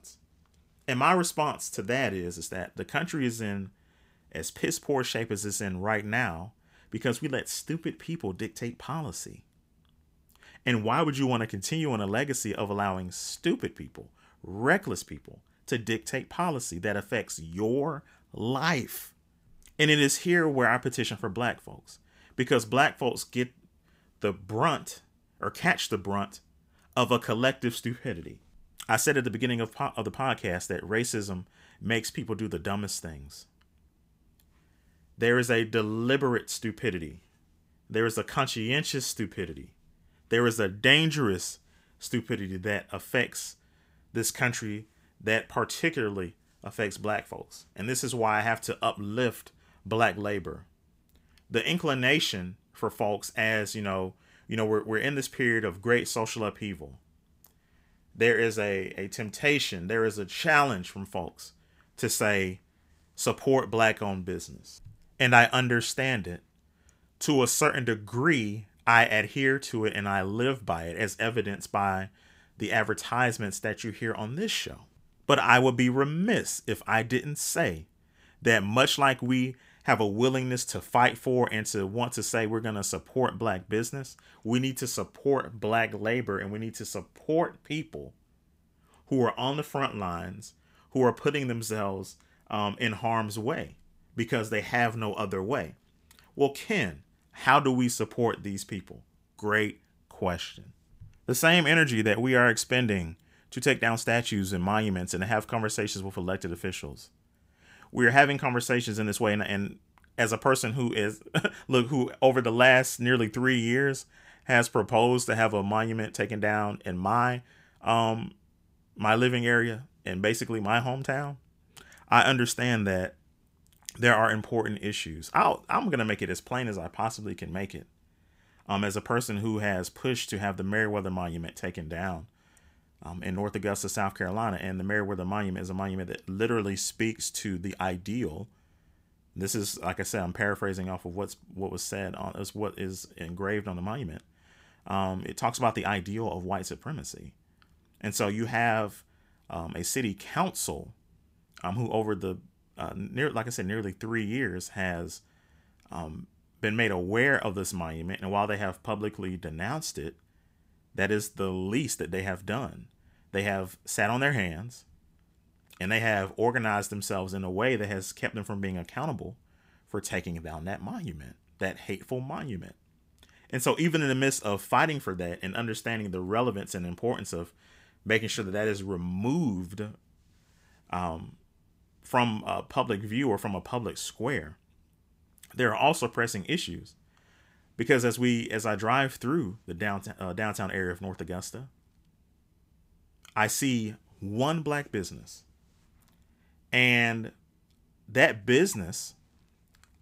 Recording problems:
none

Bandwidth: 15.5 kHz